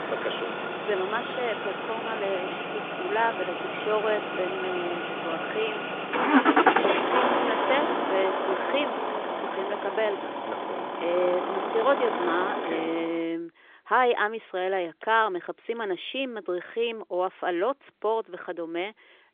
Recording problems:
phone-call audio; nothing above 3.5 kHz
traffic noise; very loud; until 13 s; 1 dB above the speech

